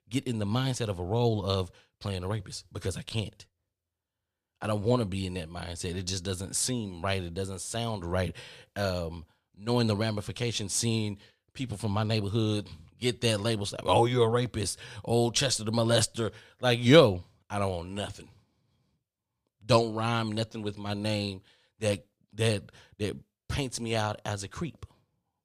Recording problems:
none

